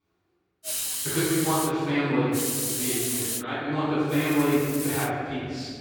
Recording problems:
room echo; strong; dies away in 2 s
off-mic speech; far
hiss; loud; from 0.5 to 1.5 s, from 2.5 to 3.5 s and at 4 s; 2 dB below the speech

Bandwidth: 18.5 kHz